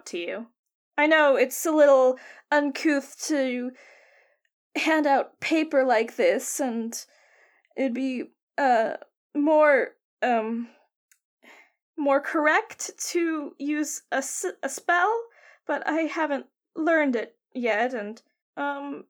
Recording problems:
none

